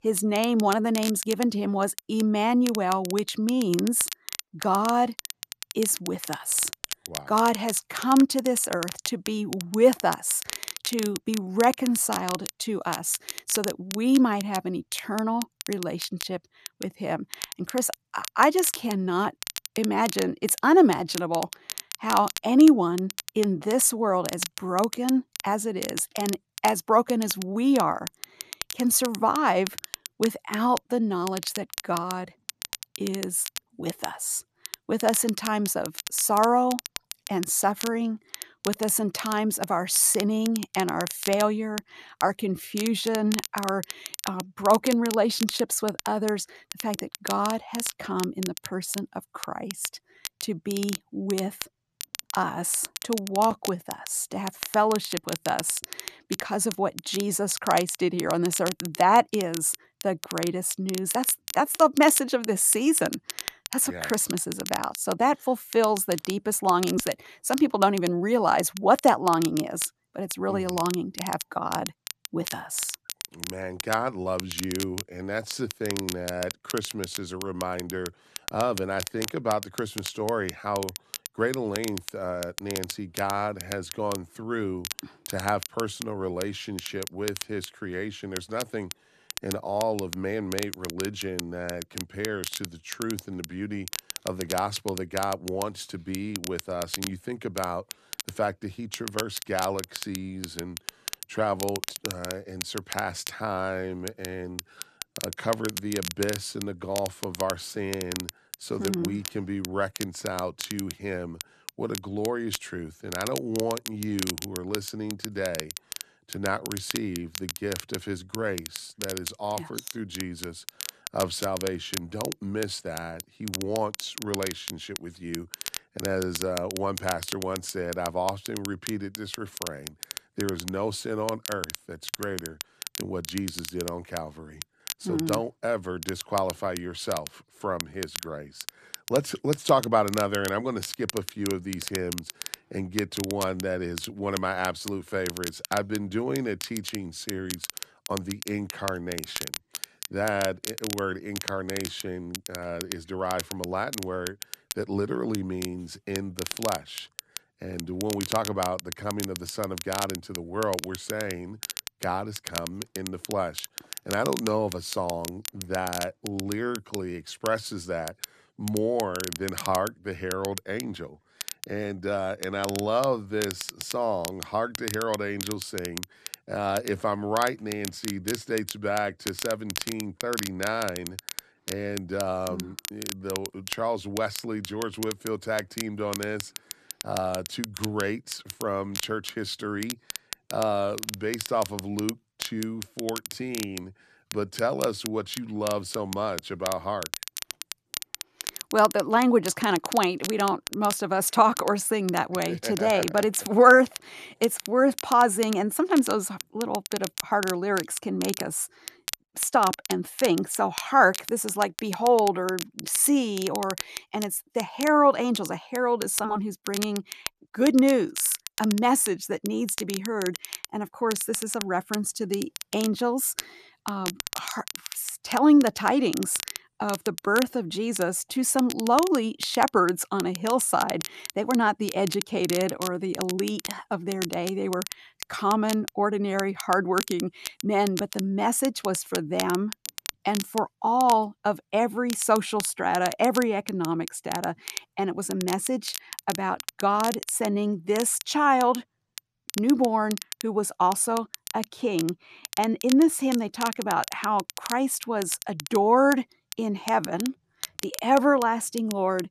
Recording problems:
crackle, like an old record; loud; 10 dB below the speech

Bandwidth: 14 kHz